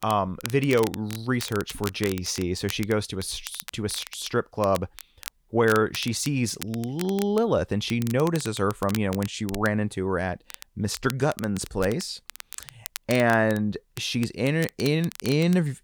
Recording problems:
crackle, like an old record; noticeable; 15 dB below the speech

